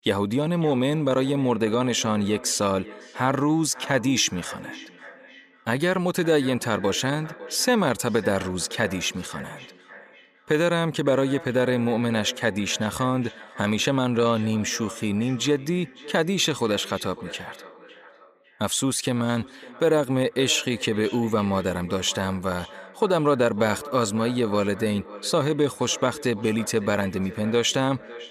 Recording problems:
echo of what is said; noticeable; throughout; 550 ms later, 15 dB below the speech

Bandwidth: 15 kHz